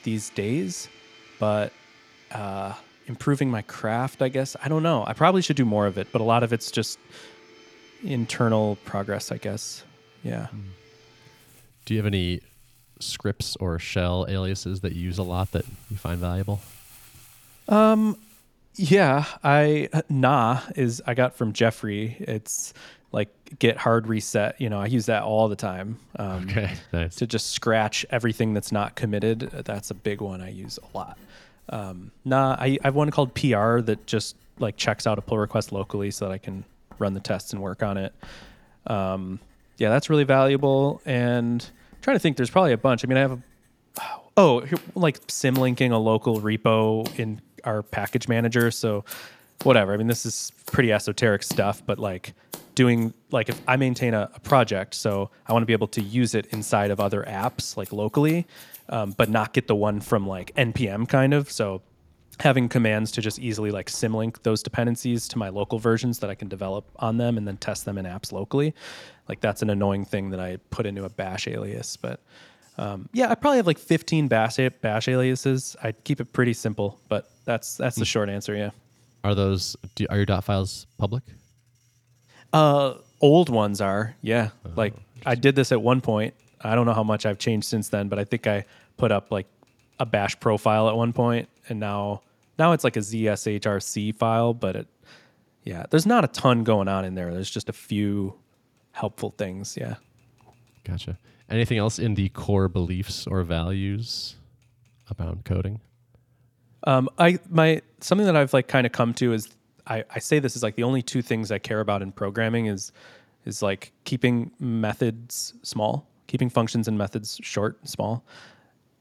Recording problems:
household noises; faint; throughout; 25 dB below the speech

